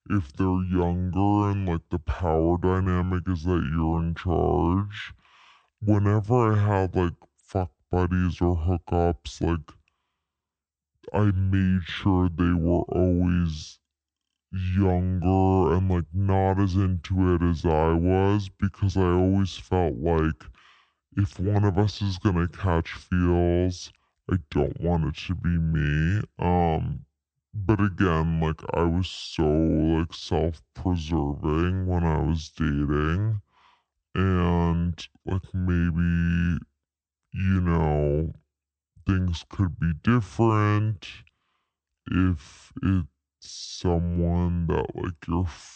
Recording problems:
wrong speed and pitch; too slow and too low; 0.6 times normal speed

